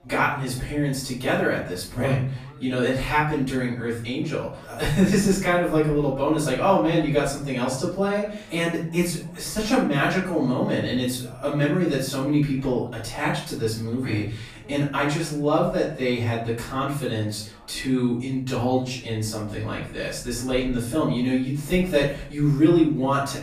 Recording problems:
off-mic speech; far
room echo; noticeable; dies away in 0.4 s
chatter from many people; faint; throughout; 25 dB below the speech

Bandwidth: 14.5 kHz